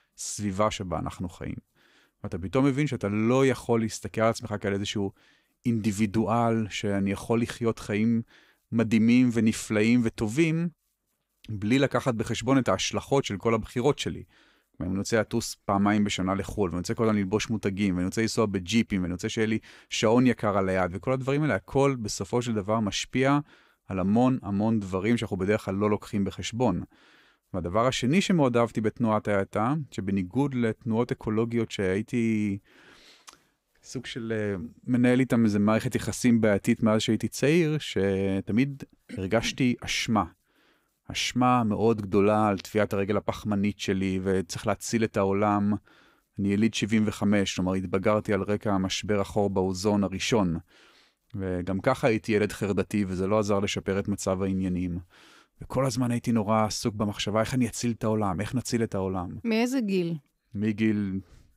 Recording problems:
none

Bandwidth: 15.5 kHz